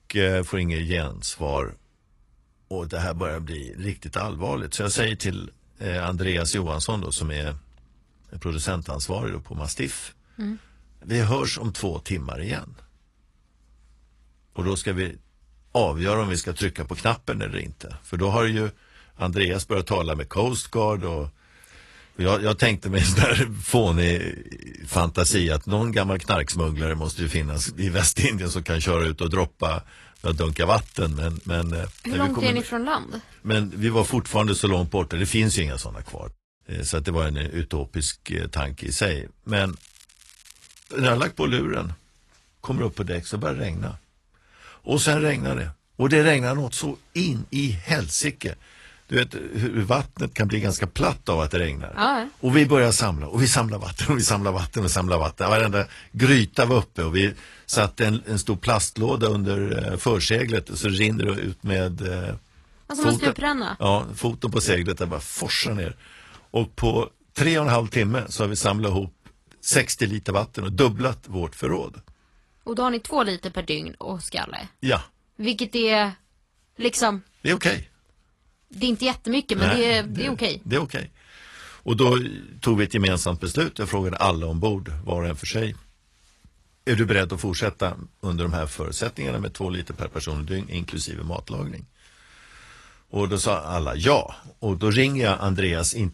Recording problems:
garbled, watery; slightly; nothing above 11 kHz
crackling; faint; 4 times, first at 30 s; 25 dB below the speech

